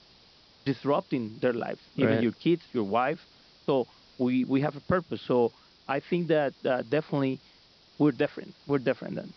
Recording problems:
high frequencies cut off; noticeable; nothing above 5.5 kHz
hiss; faint; throughout; 25 dB below the speech

